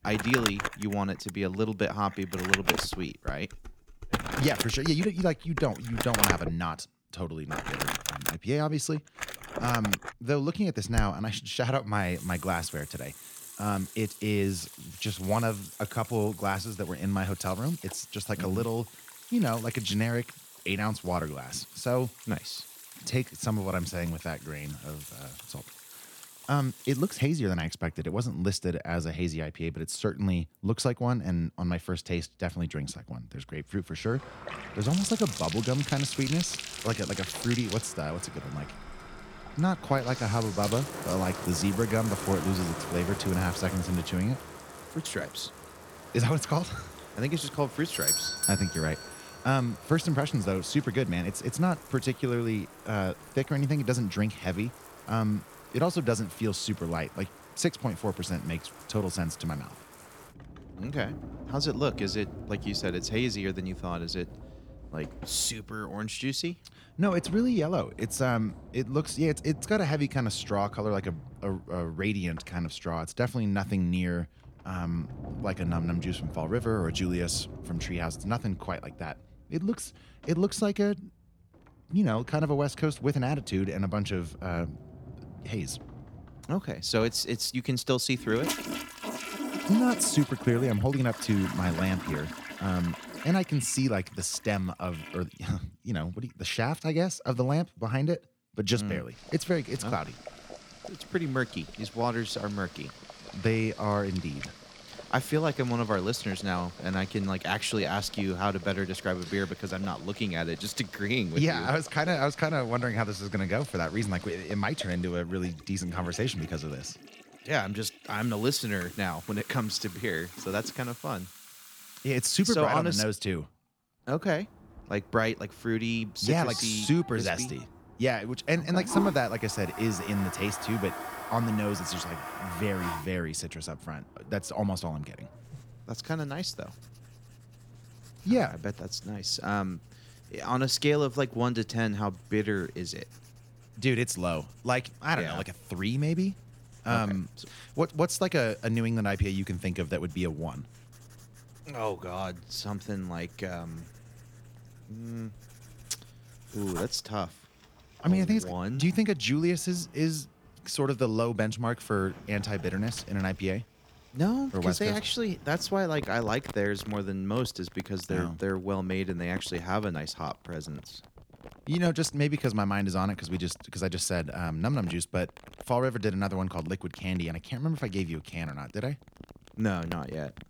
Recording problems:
household noises; loud; throughout; 10 dB below the speech
clattering dishes; noticeable; from 3 to 6.5 s; peak 2 dB below the speech
doorbell; loud; at 48 s; peak 5 dB above the speech

